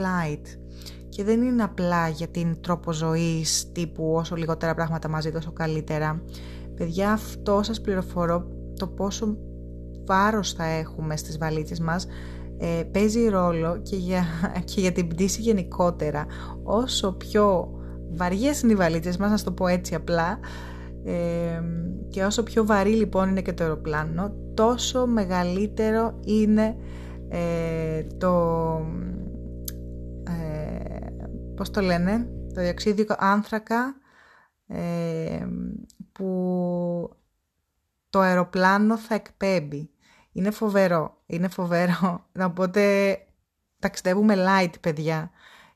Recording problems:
electrical hum; faint; until 33 s; 60 Hz, 20 dB below the speech
abrupt cut into speech; at the start

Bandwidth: 13.5 kHz